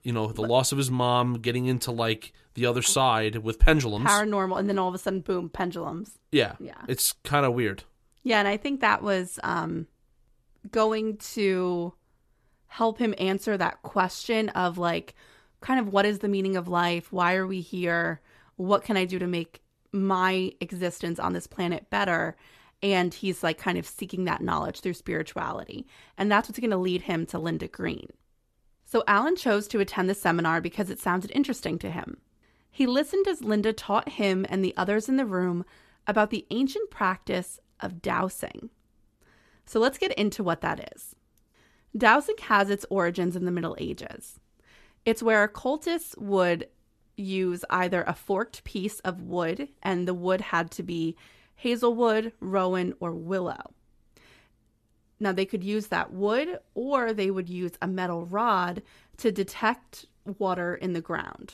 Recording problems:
none

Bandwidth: 13.5 kHz